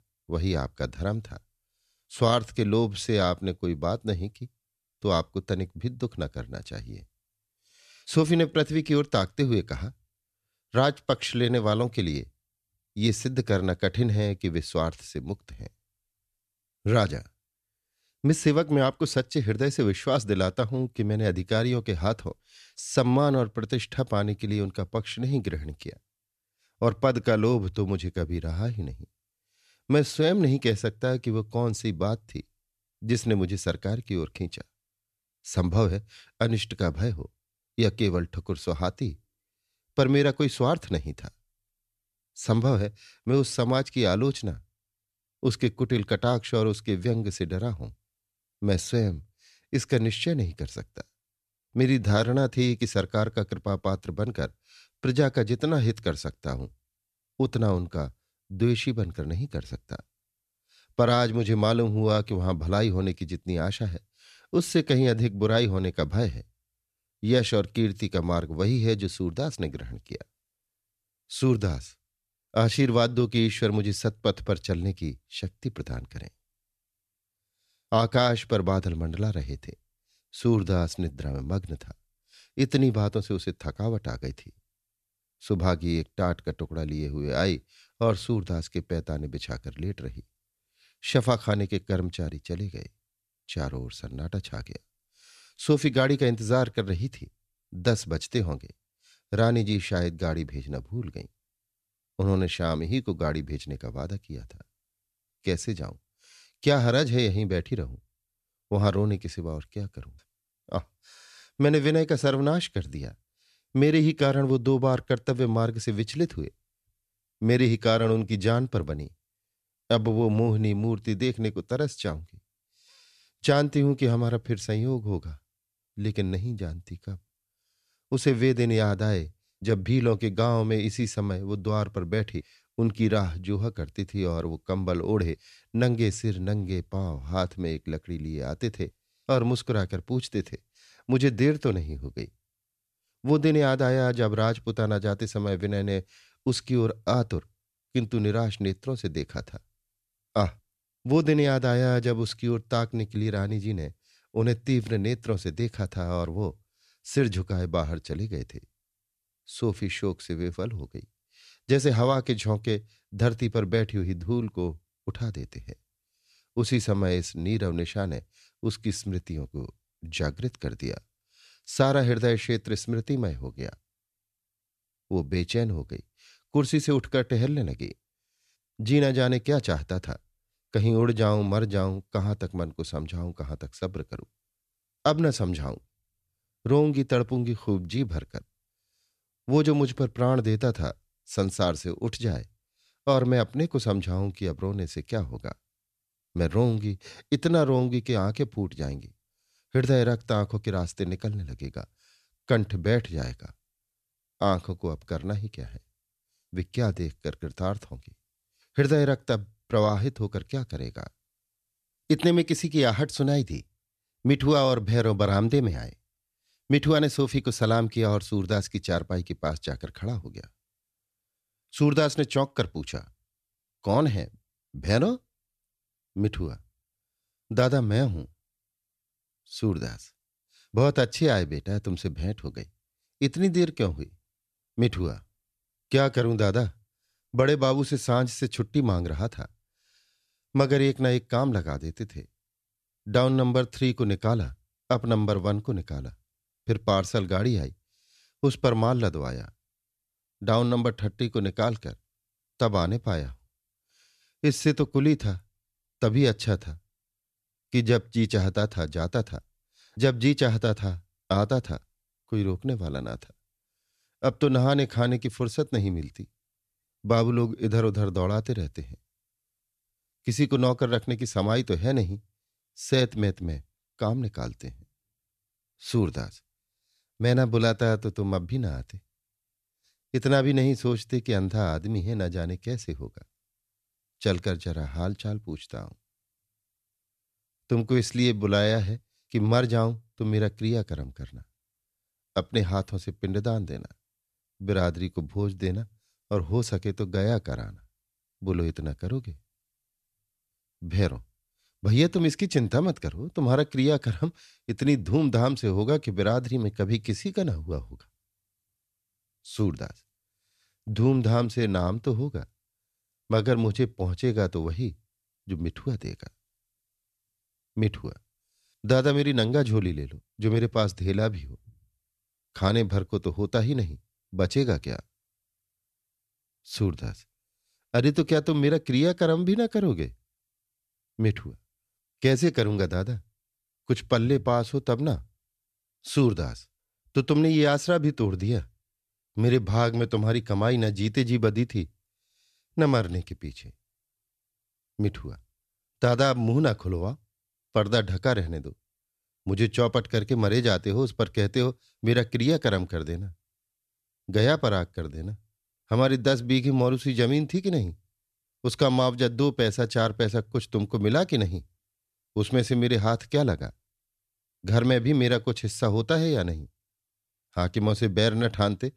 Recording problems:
none

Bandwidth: 14 kHz